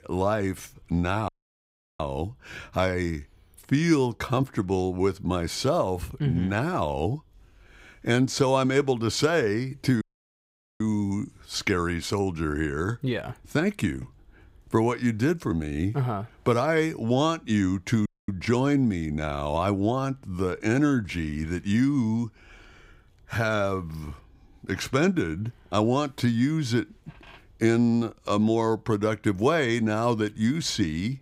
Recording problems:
audio cutting out; at 1.5 s for 0.5 s, at 10 s for 1 s and at 18 s

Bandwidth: 15.5 kHz